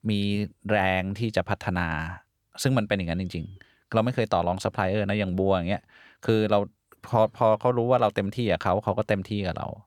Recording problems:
none

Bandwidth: 18.5 kHz